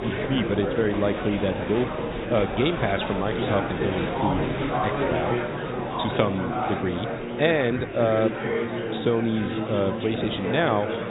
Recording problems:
high frequencies cut off; severe; nothing above 4 kHz
murmuring crowd; loud; throughout; 2 dB below the speech

